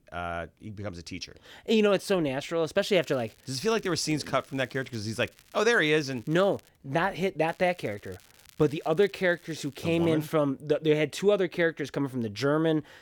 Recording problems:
crackling; faint; from 3 to 6.5 s and from 7.5 to 10 s; 30 dB below the speech

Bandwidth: 18 kHz